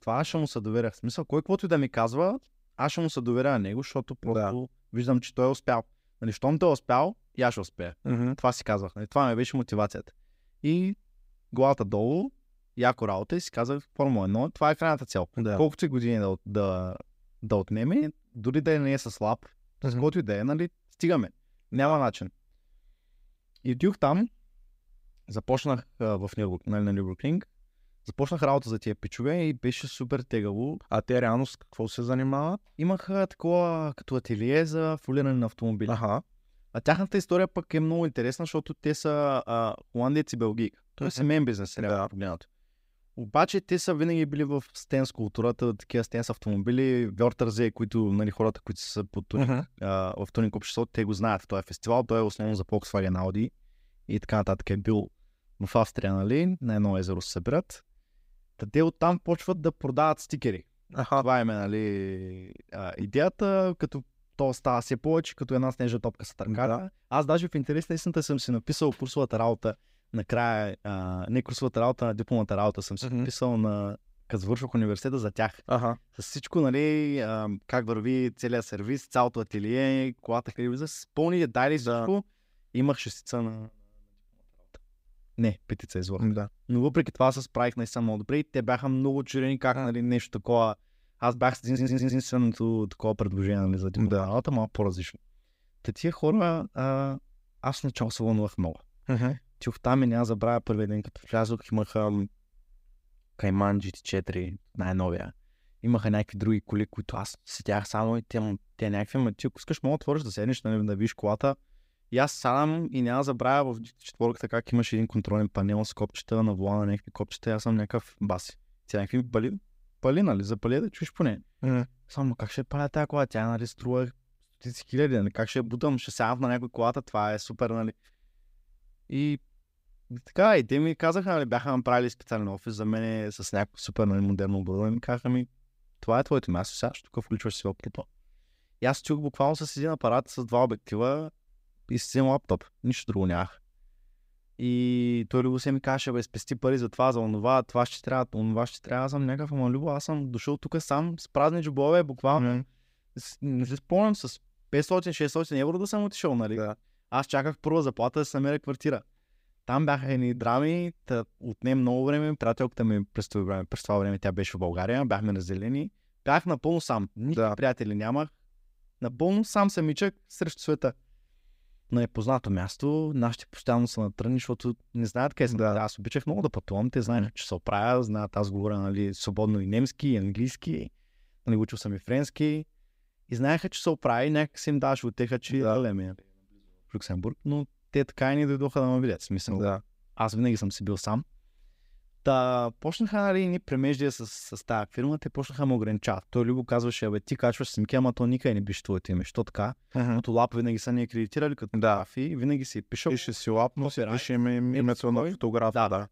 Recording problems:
audio stuttering; at 1:32

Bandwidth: 15.5 kHz